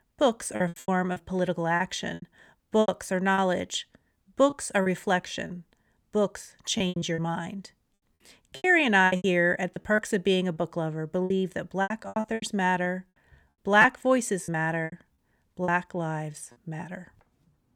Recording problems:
choppy; very; 13% of the speech affected

